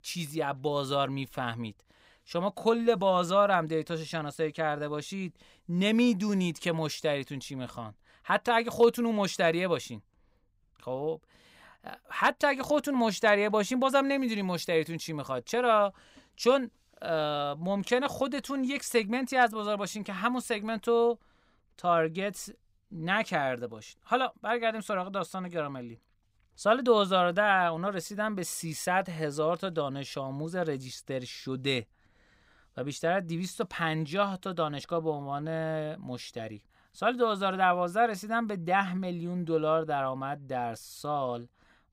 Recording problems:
none

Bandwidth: 15.5 kHz